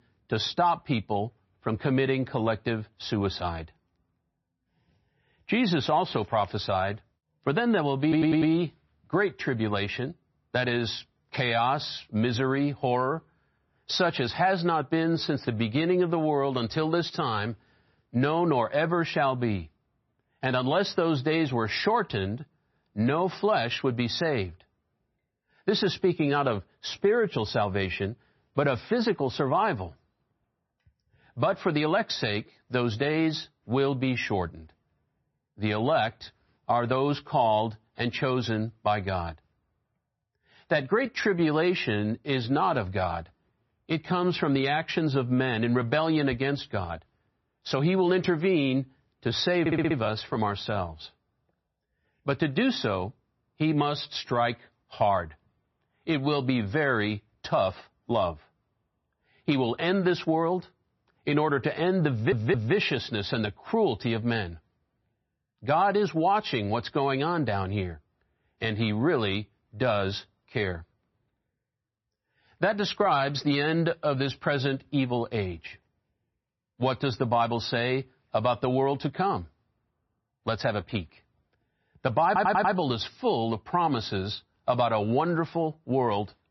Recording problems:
garbled, watery; slightly; nothing above 6 kHz
audio stuttering; 4 times, first at 8 s

